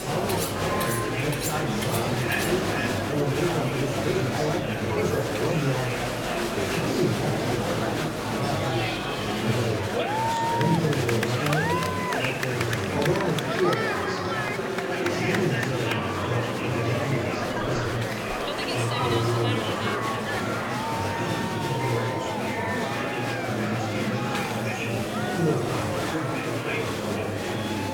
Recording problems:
off-mic speech; far
room echo; slight; dies away in 0.6 s
murmuring crowd; very loud; throughout; 3 dB above the speech
household noises; loud; until 8 s; 7 dB below the speech
hiss; noticeable; throughout; 15 dB below the speech

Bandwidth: 17 kHz